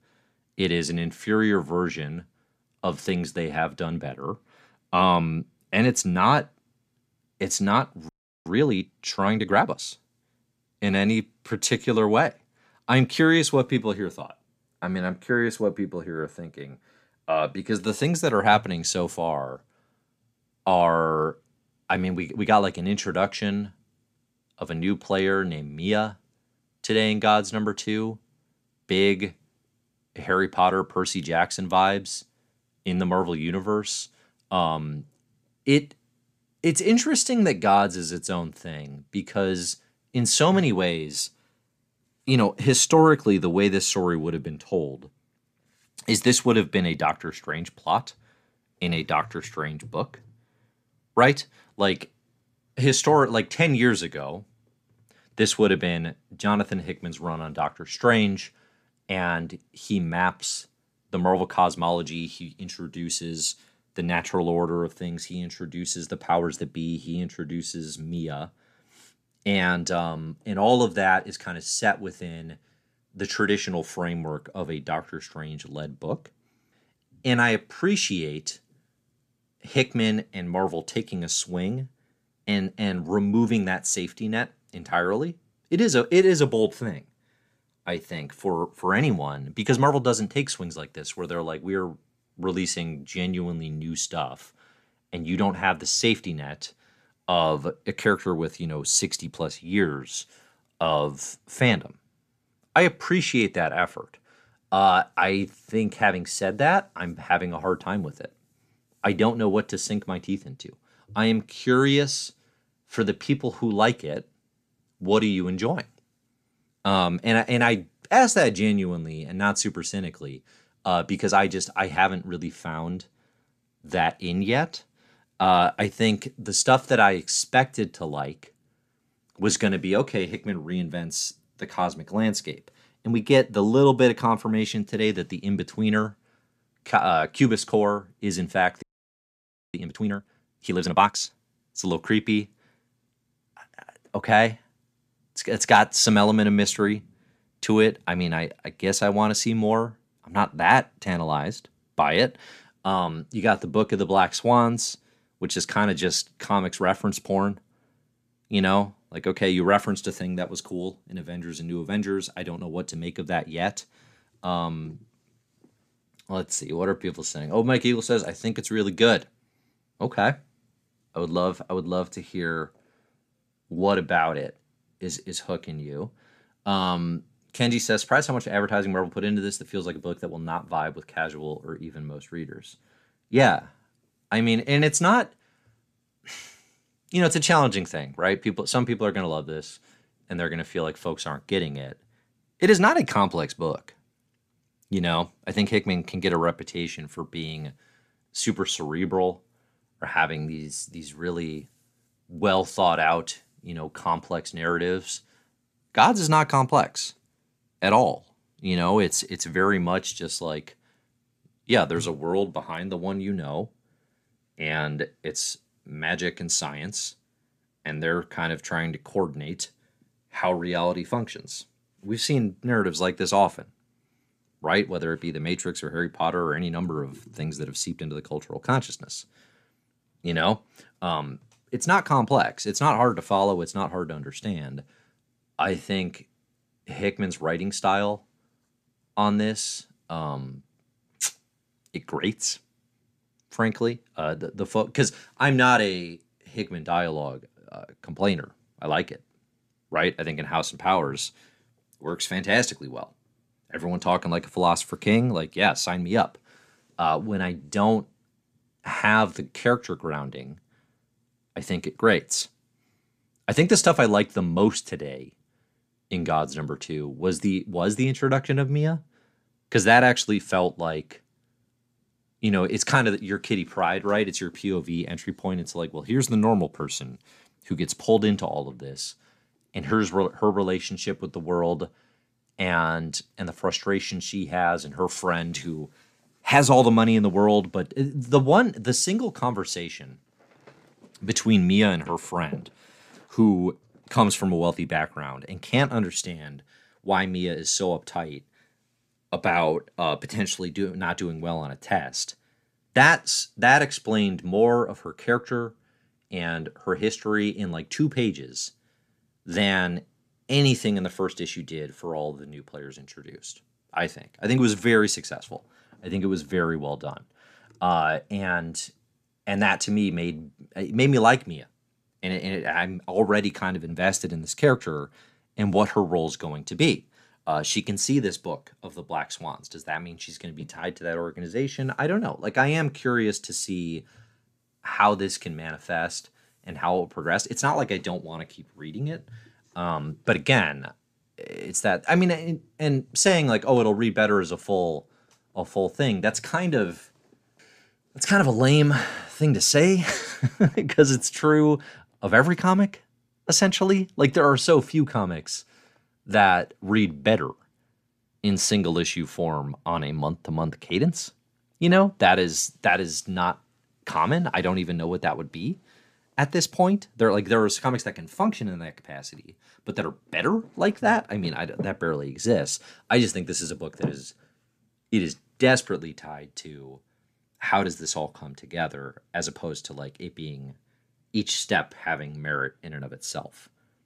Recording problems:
audio freezing; at 8 s and at 2:19 for 1 s

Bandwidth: 14.5 kHz